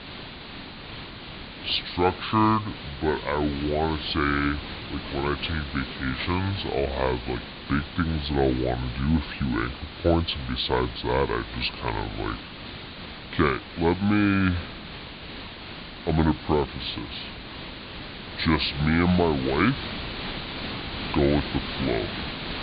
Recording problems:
high frequencies cut off; severe; nothing above 4.5 kHz
wrong speed and pitch; too slow and too low; 0.7 times normal speed
hiss; loud; throughout; 10 dB below the speech

